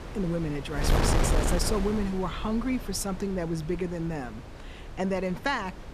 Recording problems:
wind noise on the microphone; heavy; 2 dB below the speech

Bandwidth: 14.5 kHz